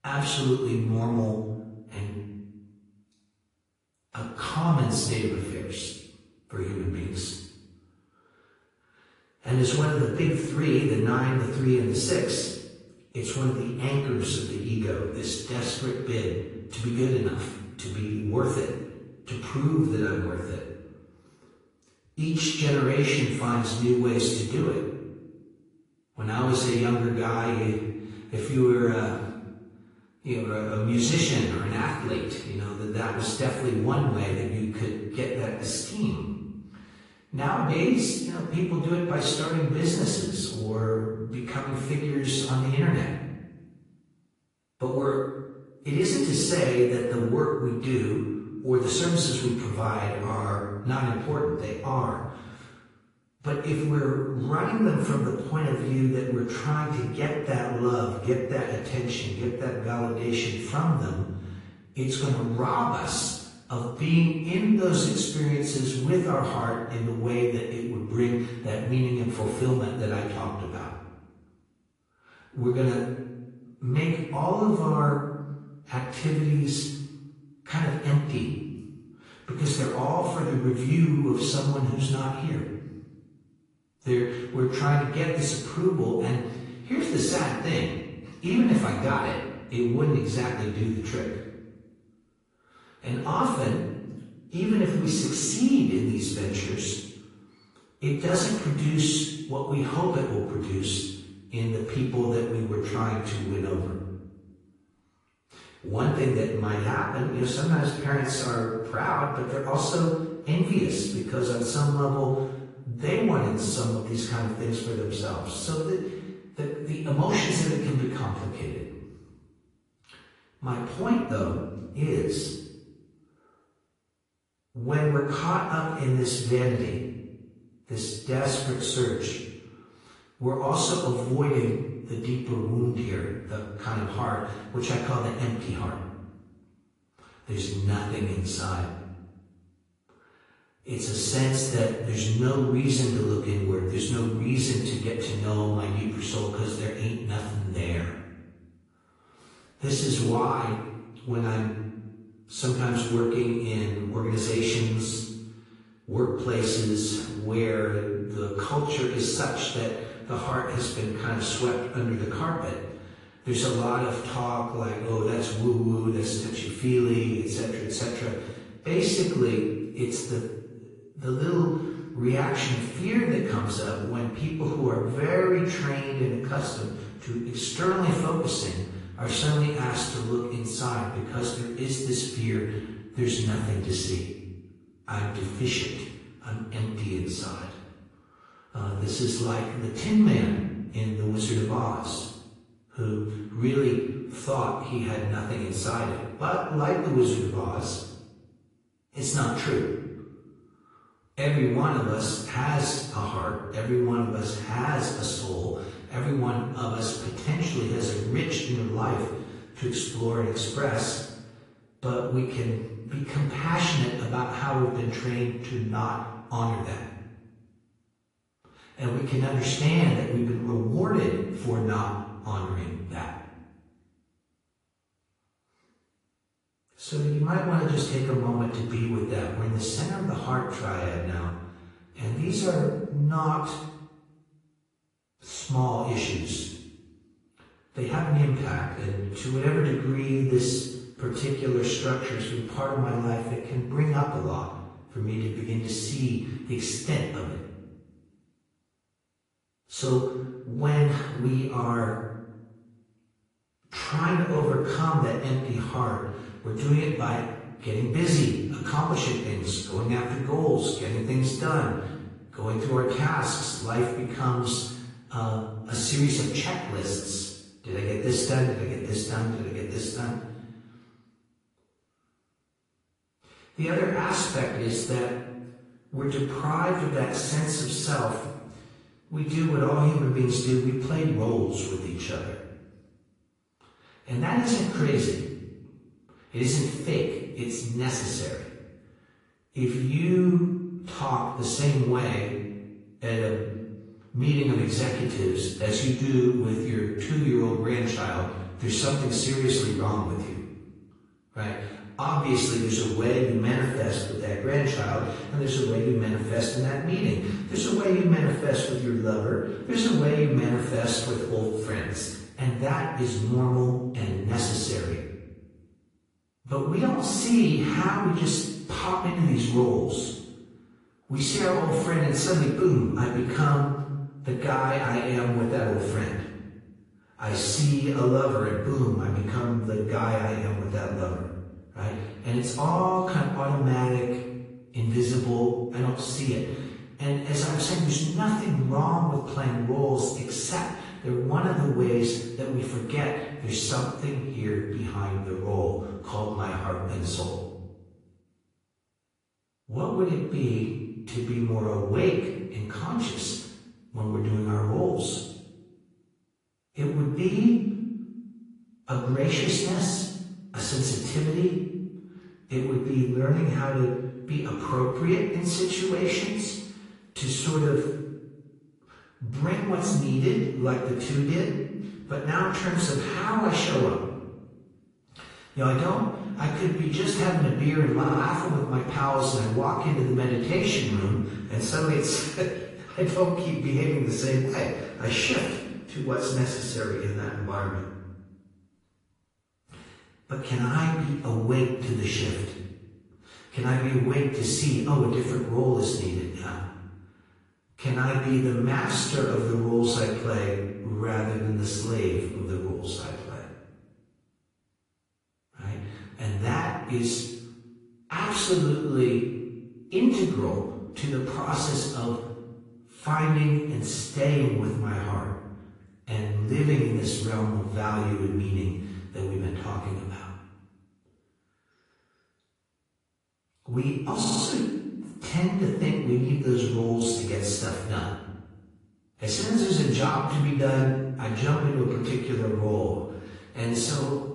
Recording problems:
off-mic speech; far
room echo; noticeable; dies away in 1 s
garbled, watery; slightly; nothing above 9 kHz
audio stuttering; at 6:18 and at 7:04

